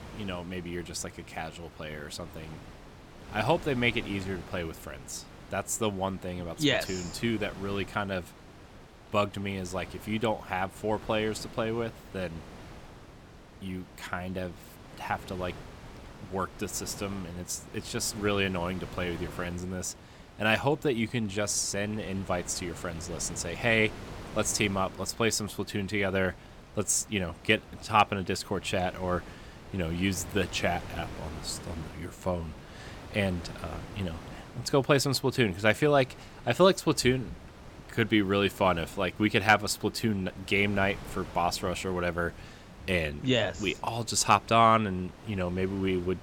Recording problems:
wind noise on the microphone; occasional gusts; 20 dB below the speech

